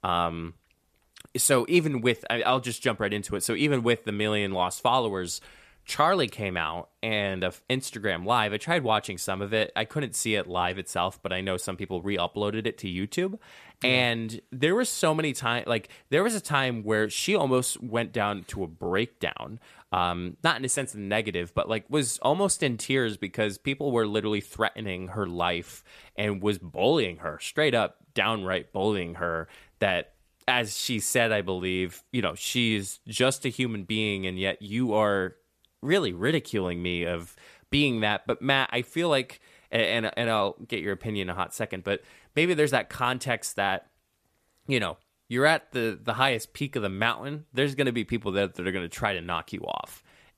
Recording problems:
none

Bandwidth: 14.5 kHz